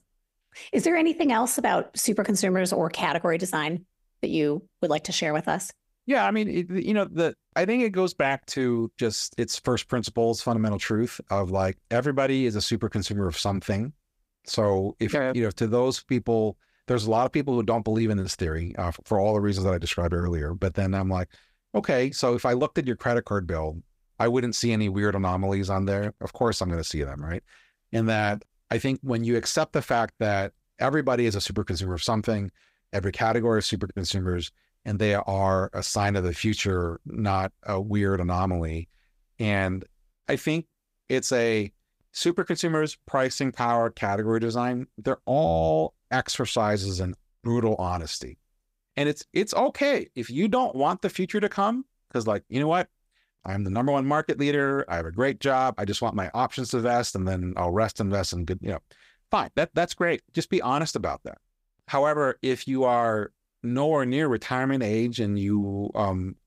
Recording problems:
none

